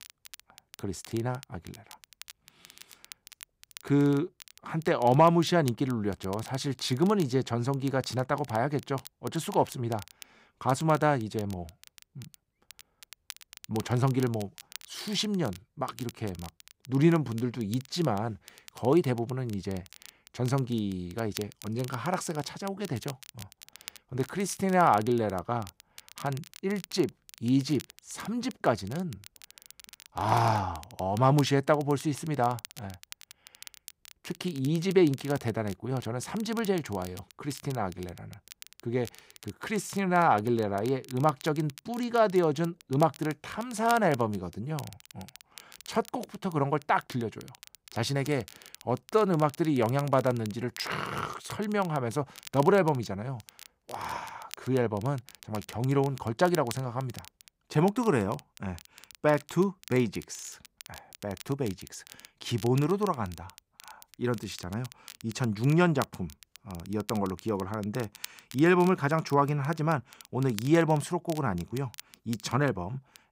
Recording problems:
crackle, like an old record; noticeable; 20 dB below the speech

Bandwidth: 15.5 kHz